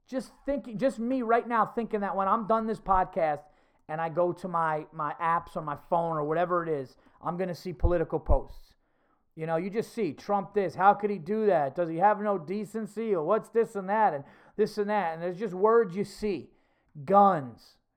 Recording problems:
muffled; very; fading above 2 kHz

